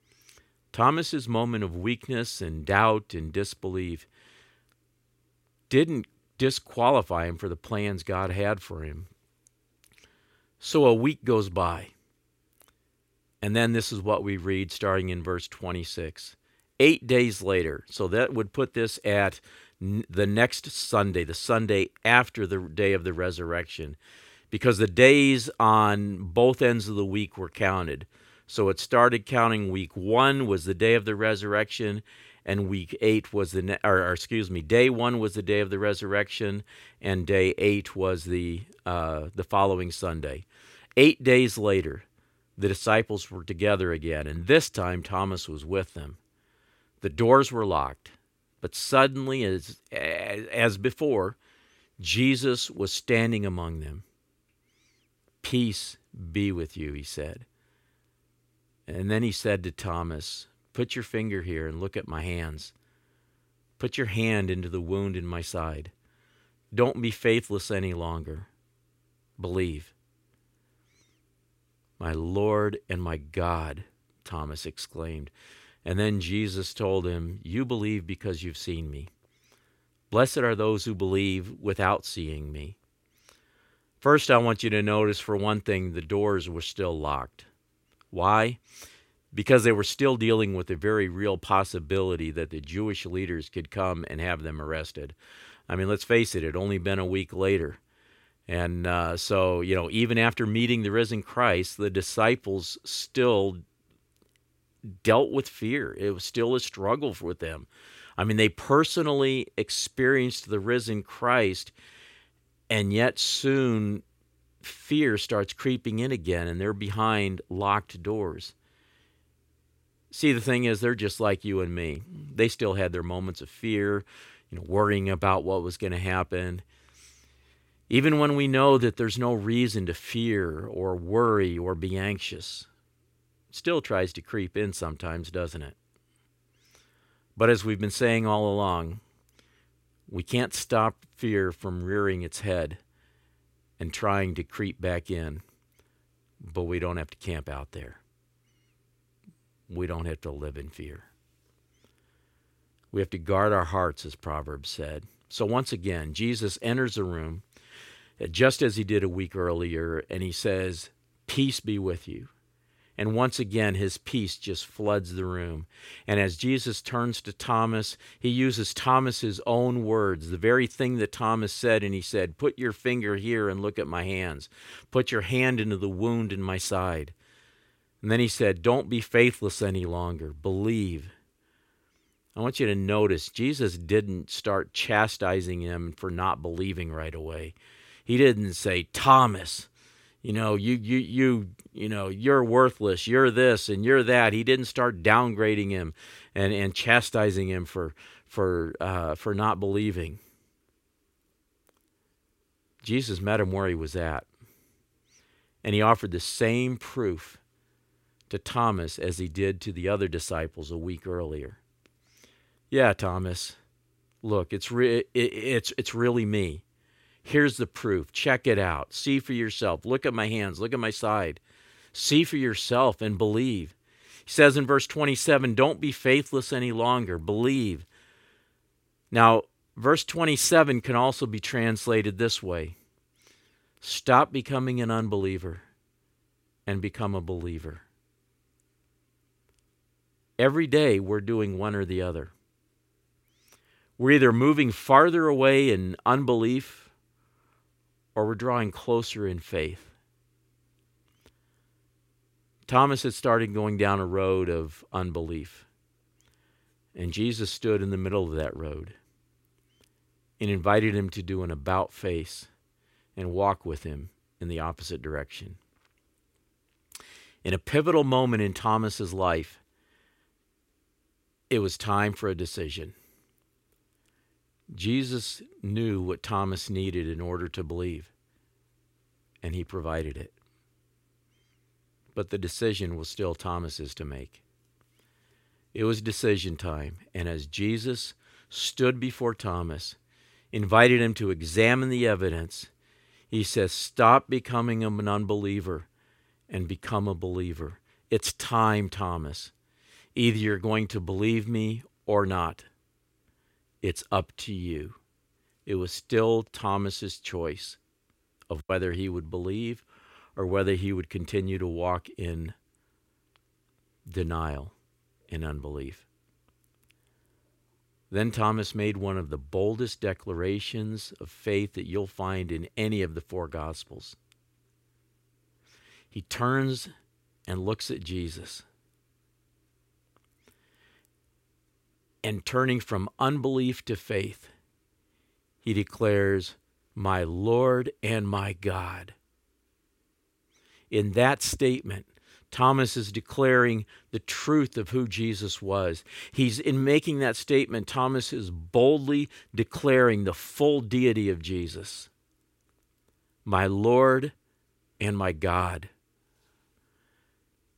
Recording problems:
none

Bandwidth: 16 kHz